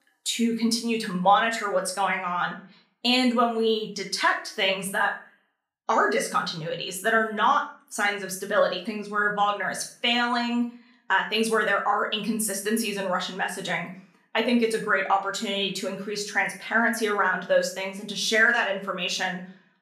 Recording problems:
room echo; slight; dies away in 0.4 s
off-mic speech; somewhat distant

